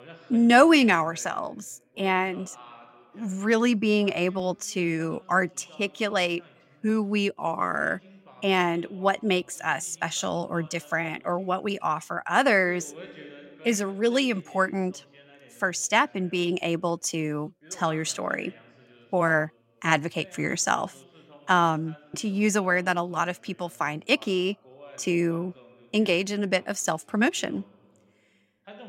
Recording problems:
voice in the background; faint; throughout; 25 dB below the speech

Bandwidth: 16 kHz